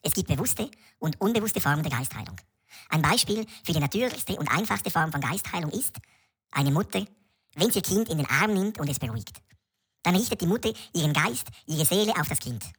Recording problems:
wrong speed and pitch; too fast and too high; 1.6 times normal speed

